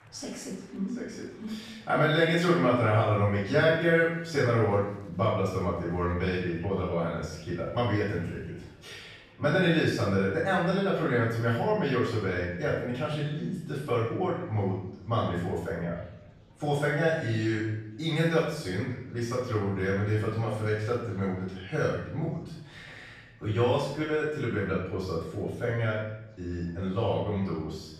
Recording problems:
off-mic speech; far
room echo; noticeable; dies away in 0.8 s
murmuring crowd; faint; throughout; 30 dB below the speech

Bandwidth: 14.5 kHz